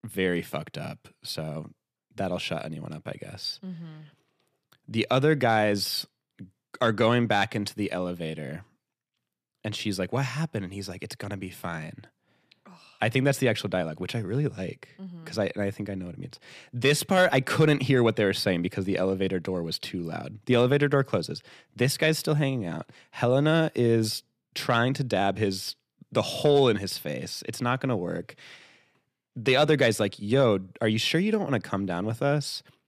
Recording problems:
none

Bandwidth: 14.5 kHz